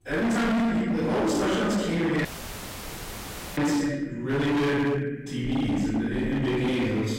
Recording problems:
distortion; heavy; 31% of the sound clipped
room echo; strong; dies away in 1.3 s
off-mic speech; far
audio cutting out; at 2.5 s for 1.5 s

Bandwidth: 16 kHz